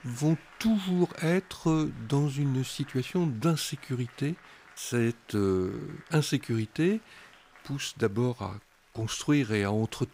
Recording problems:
crowd noise; faint; throughout; 25 dB below the speech

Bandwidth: 15.5 kHz